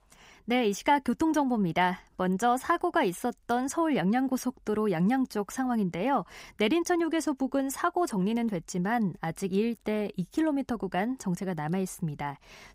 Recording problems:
none

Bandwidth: 15.5 kHz